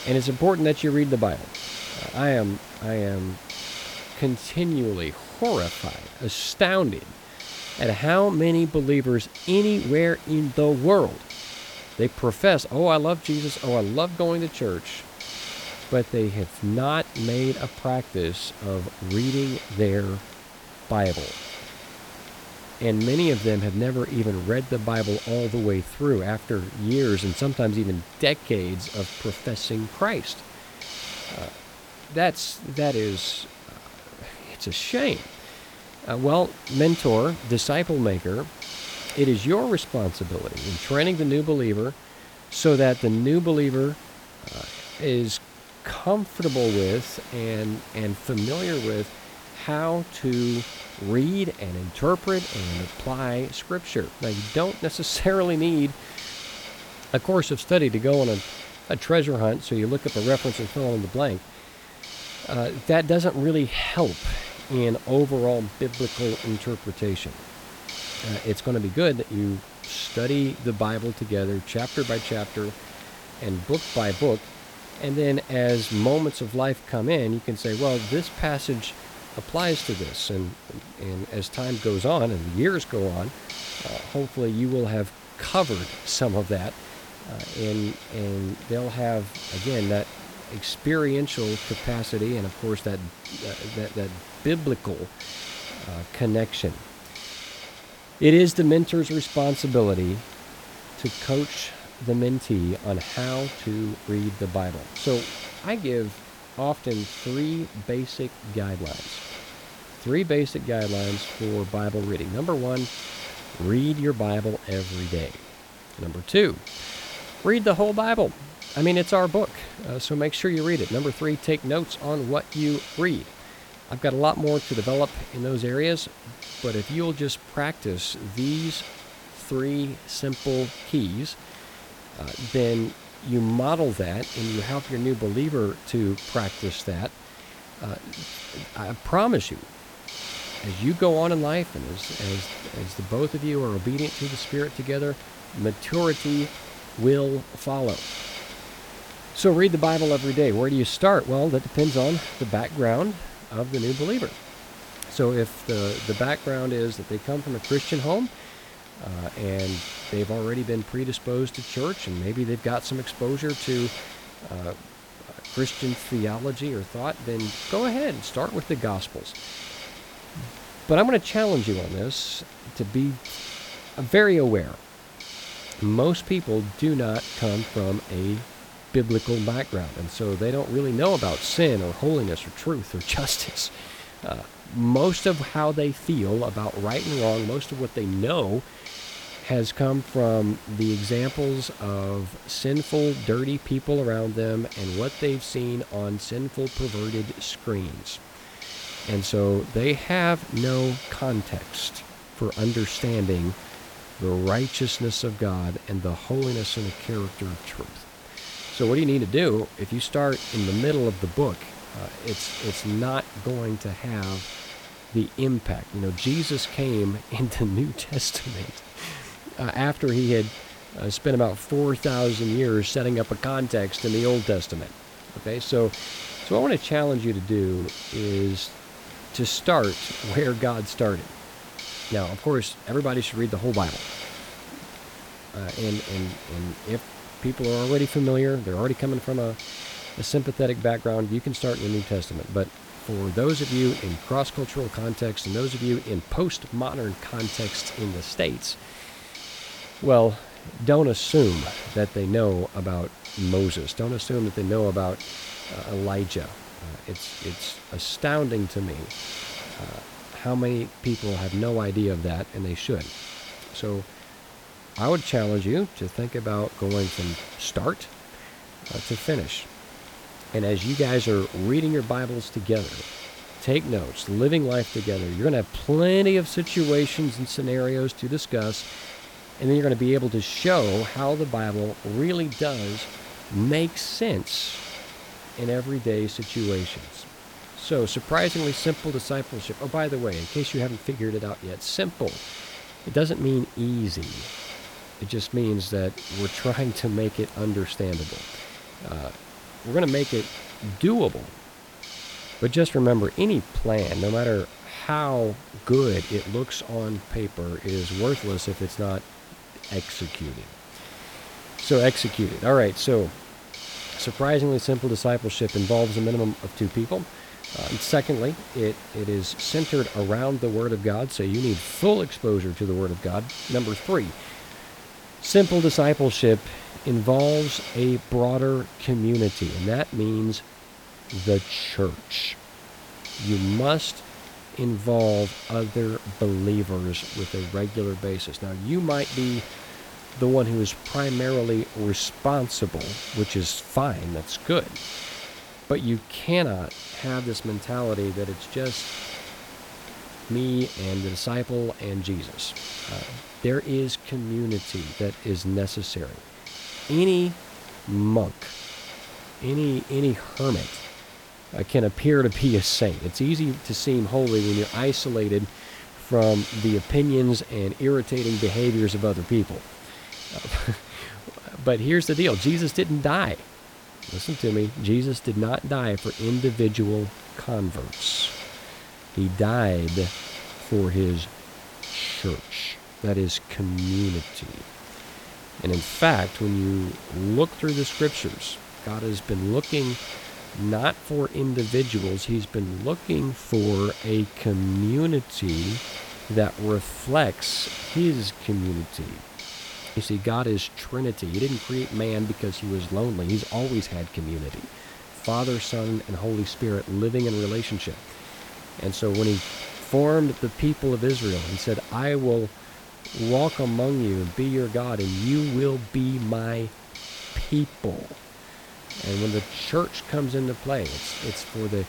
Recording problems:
hiss; noticeable; throughout; 15 dB below the speech

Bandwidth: 18.5 kHz